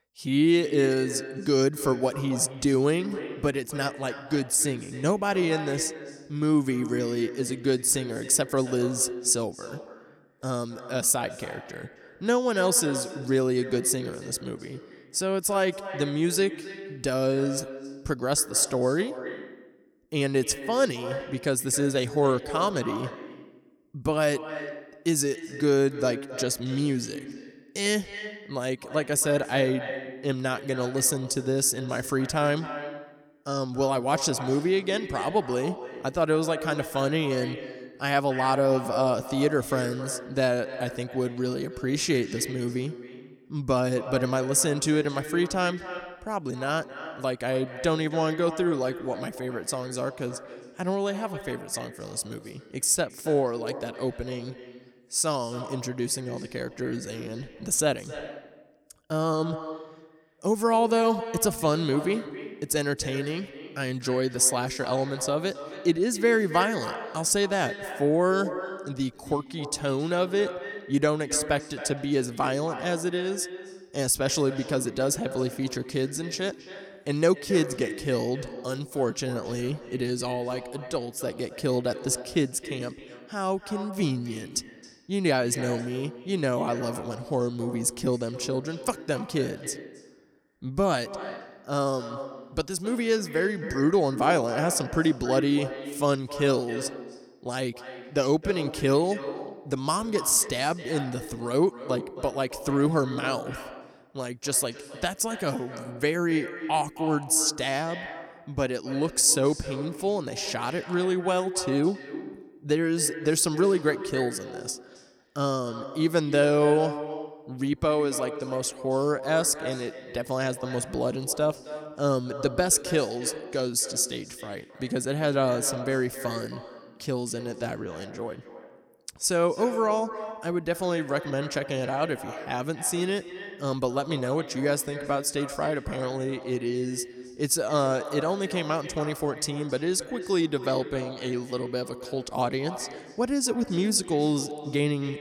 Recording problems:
echo of what is said; strong; throughout; 270 ms later, 10 dB below the speech

